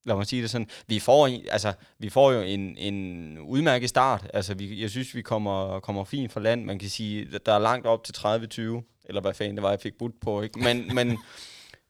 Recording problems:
none

